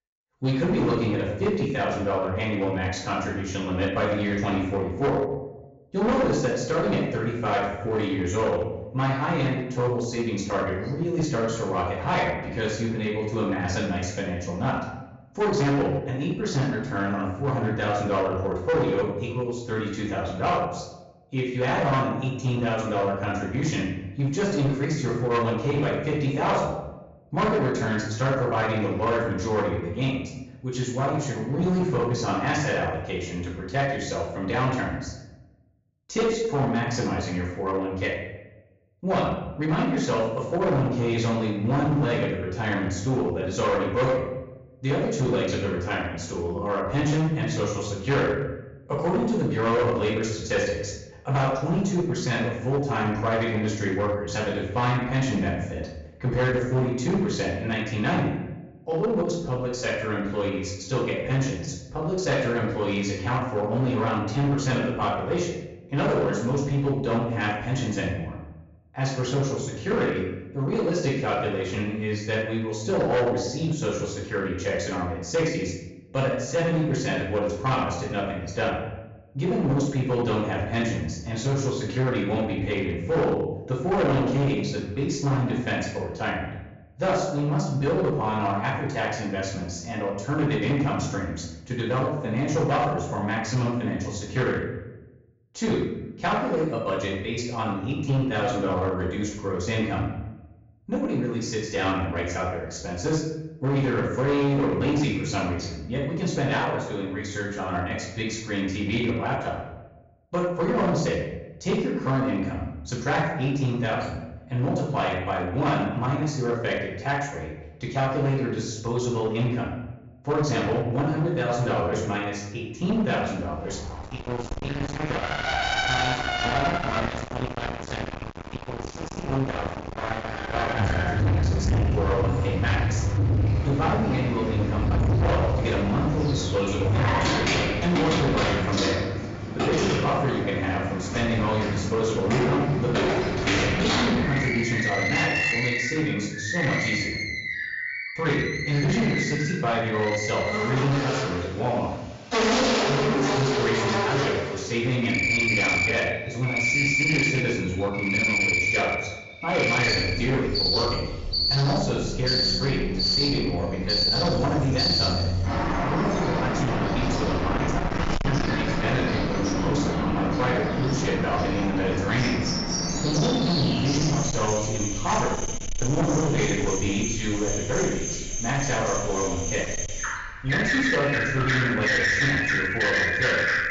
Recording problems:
distortion; heavy; 15% of the sound clipped
off-mic speech; far
room echo; noticeable; dies away in 0.8 s
high frequencies cut off; noticeable; nothing above 7.5 kHz
animal sounds; very loud; from 2:04 on; 1 dB above the speech

